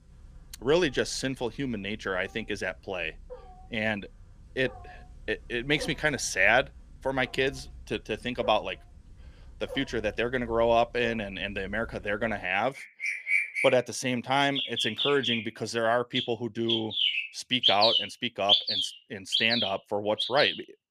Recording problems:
animal sounds; very loud; throughout; 1 dB above the speech

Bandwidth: 15 kHz